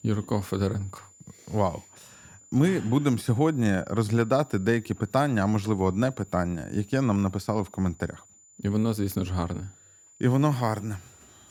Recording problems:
high-pitched whine; faint; throughout; 7 kHz, 25 dB below the speech

